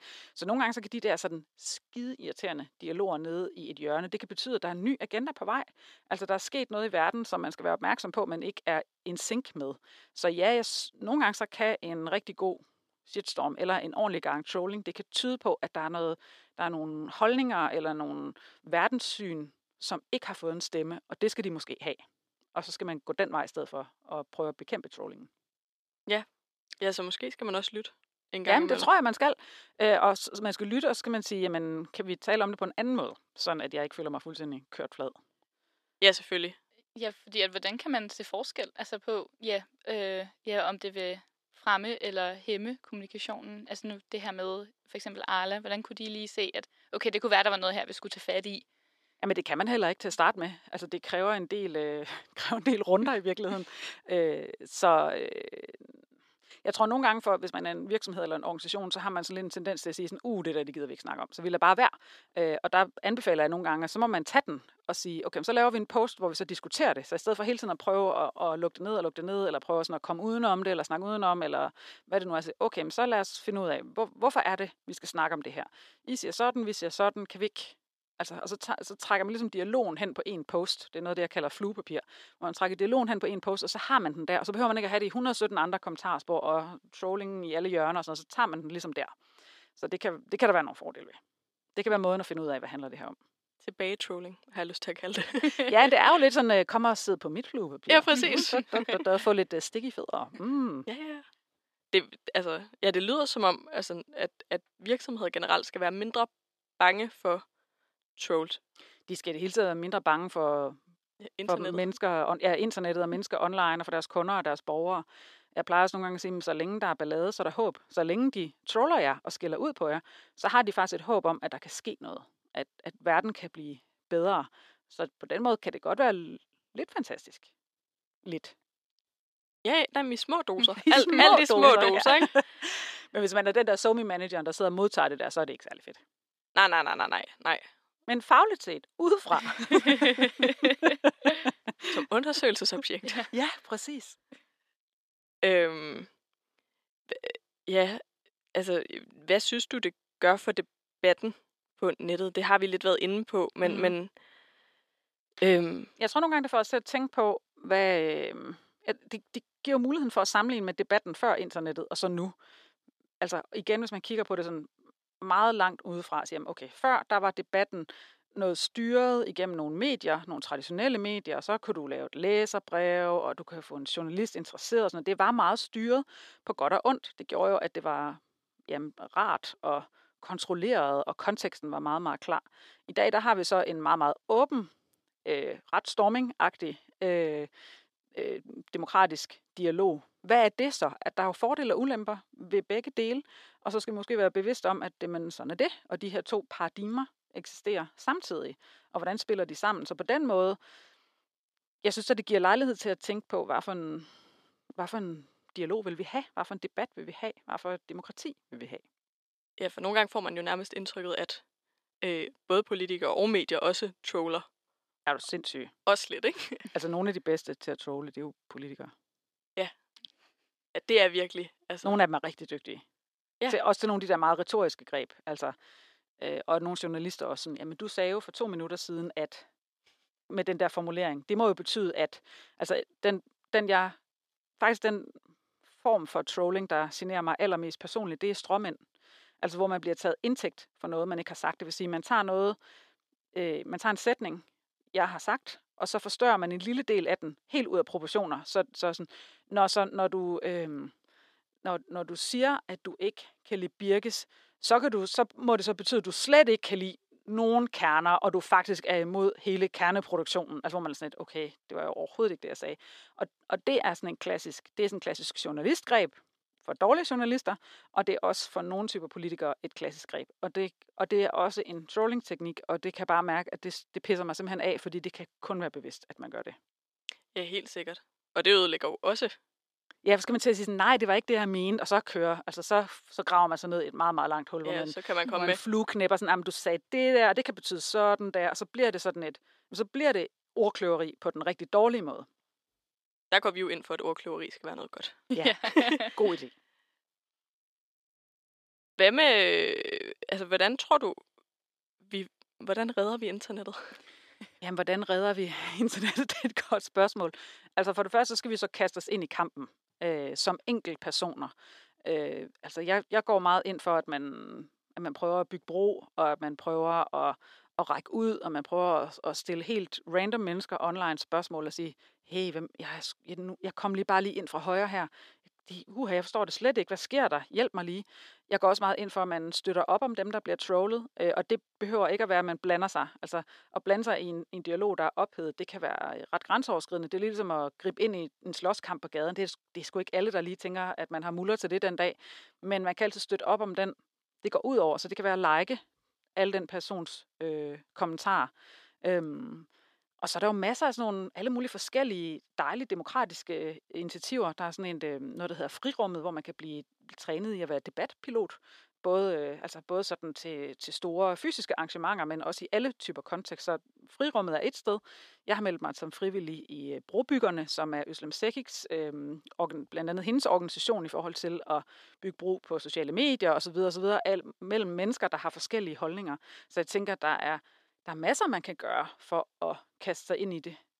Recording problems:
thin; somewhat; fading below 450 Hz

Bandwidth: 14 kHz